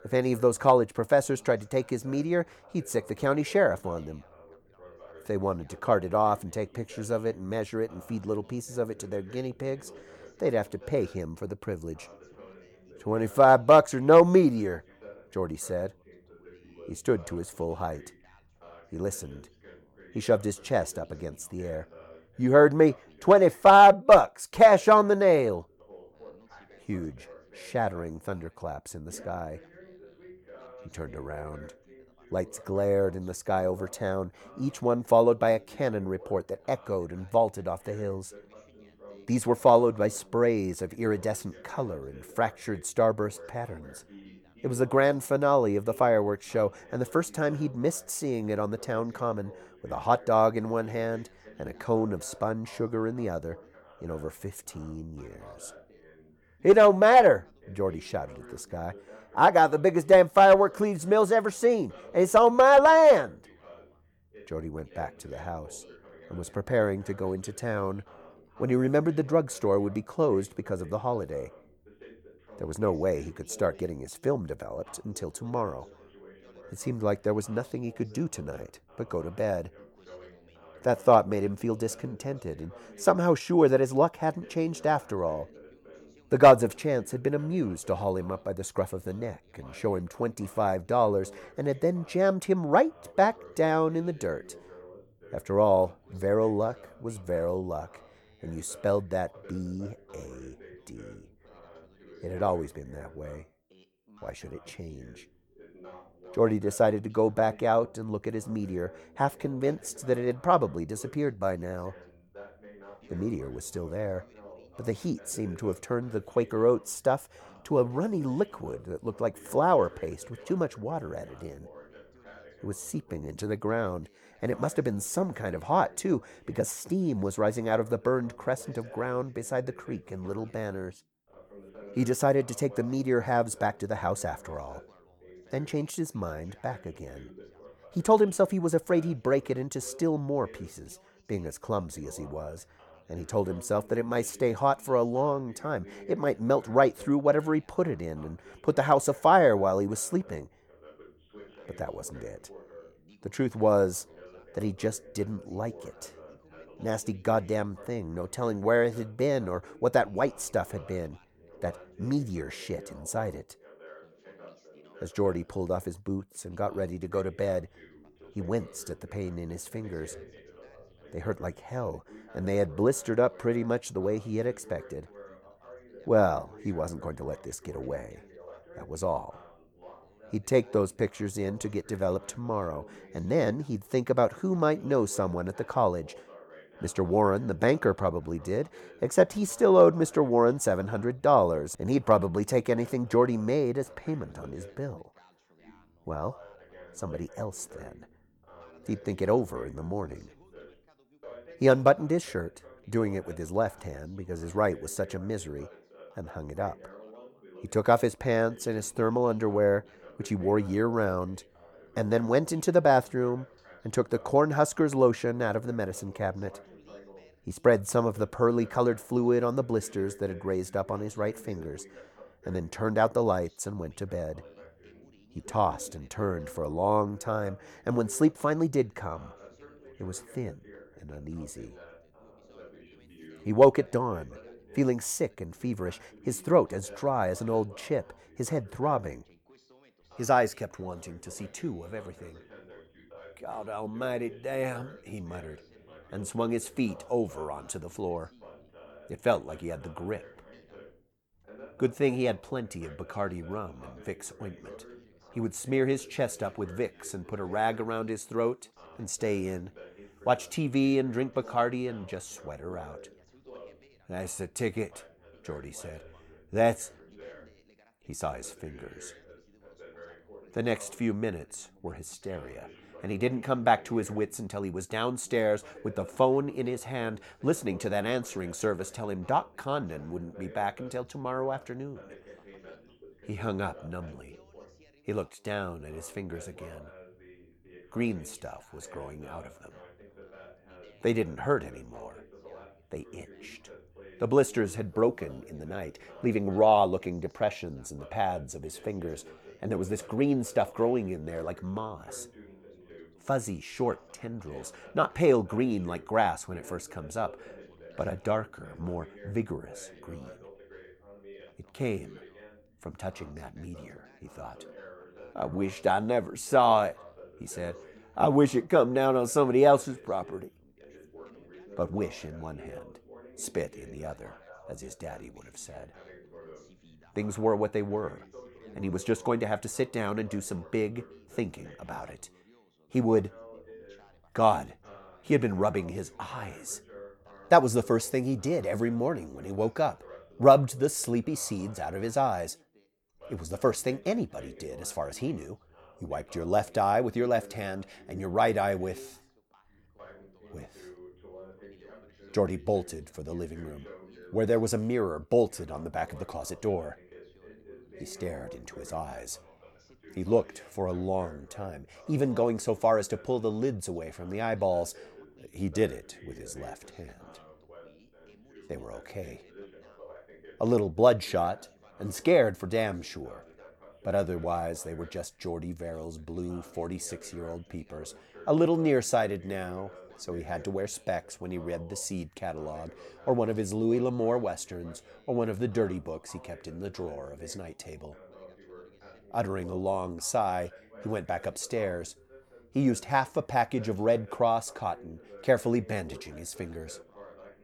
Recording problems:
background chatter; faint; throughout; 2 voices, 25 dB below the speech

